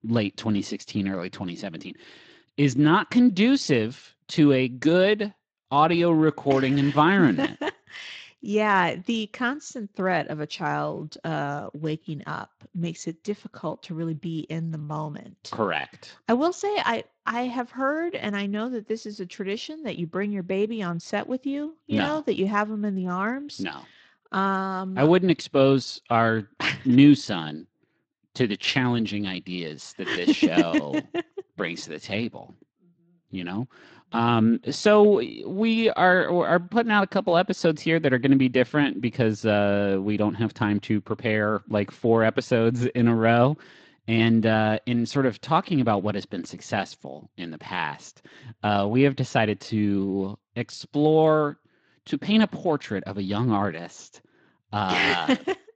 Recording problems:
garbled, watery; slightly; nothing above 7.5 kHz

